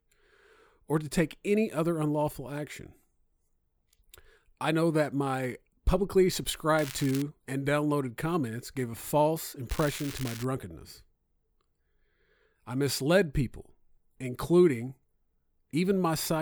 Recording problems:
crackling; noticeable; at 7 s and at 9.5 s; 15 dB below the speech
abrupt cut into speech; at the end

